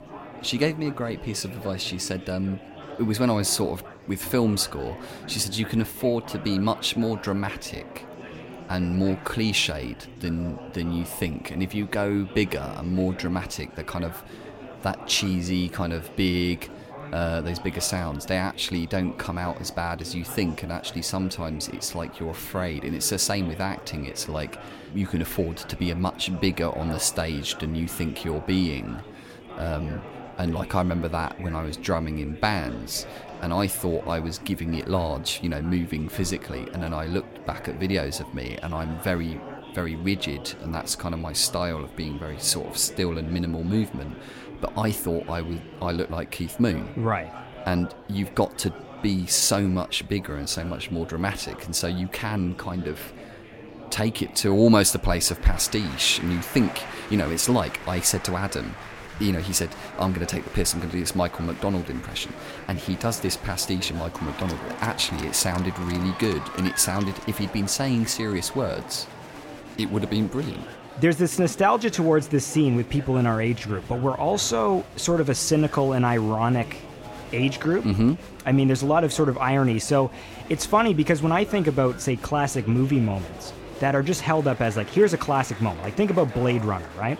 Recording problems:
murmuring crowd; noticeable; throughout; 15 dB below the speech

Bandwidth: 16.5 kHz